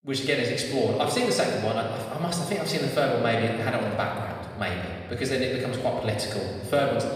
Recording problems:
off-mic speech; far
room echo; noticeable; dies away in 1.8 s

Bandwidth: 15.5 kHz